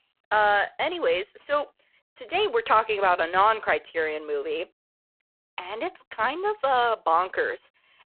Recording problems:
phone-call audio; poor line

